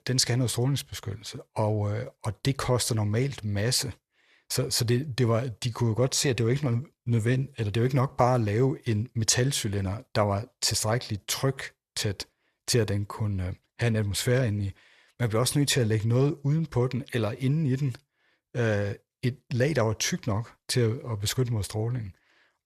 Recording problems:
none

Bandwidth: 13.5 kHz